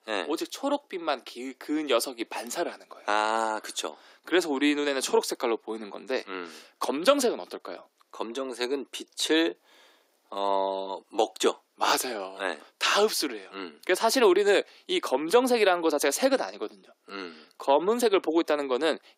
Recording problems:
thin; somewhat; fading below 300 Hz

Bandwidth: 15.5 kHz